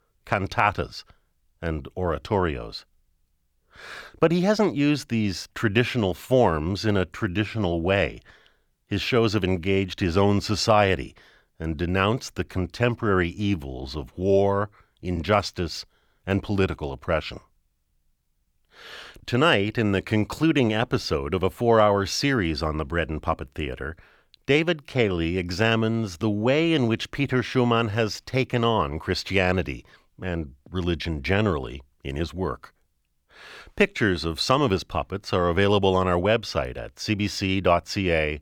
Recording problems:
none

